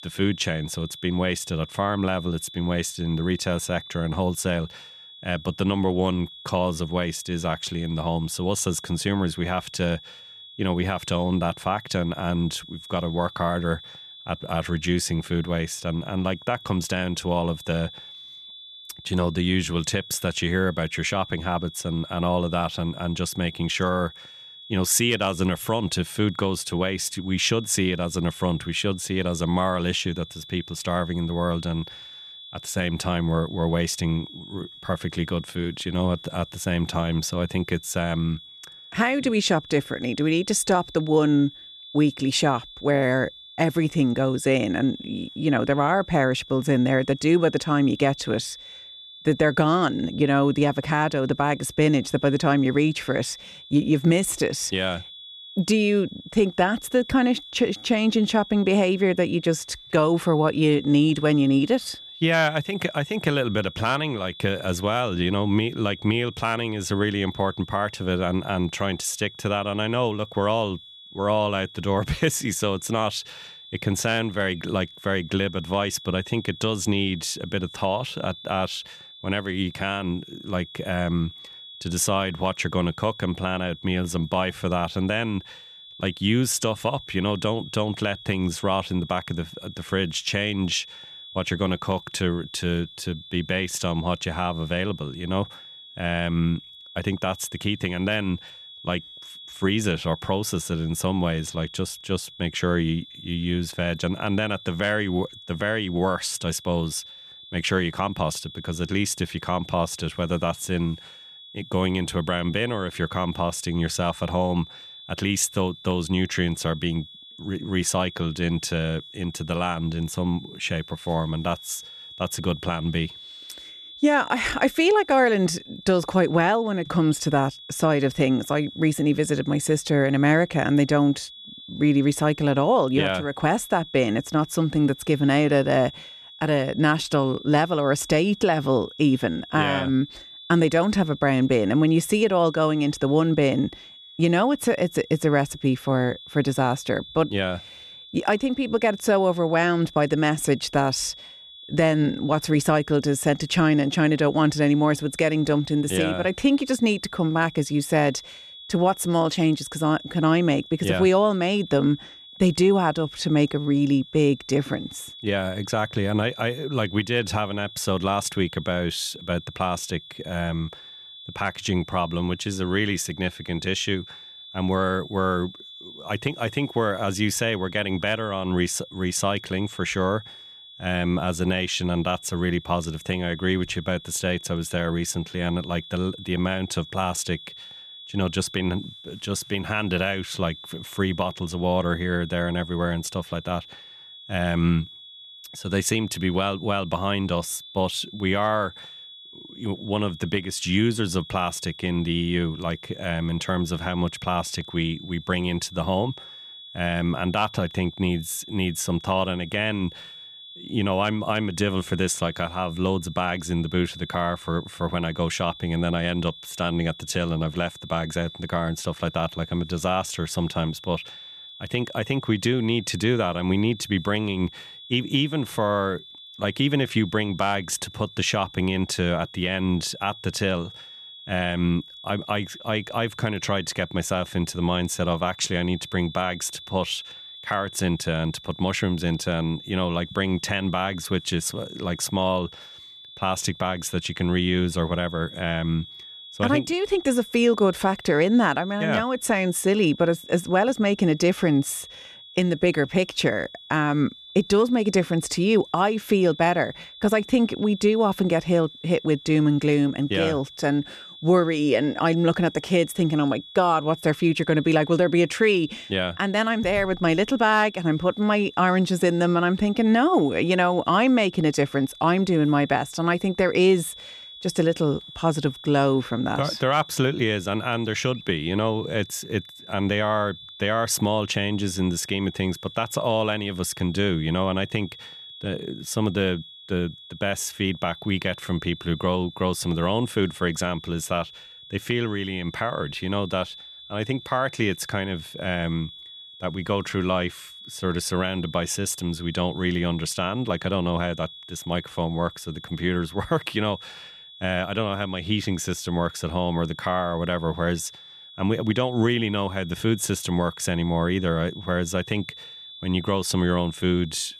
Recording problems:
high-pitched whine; noticeable; throughout; 3.5 kHz, 15 dB below the speech

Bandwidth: 13.5 kHz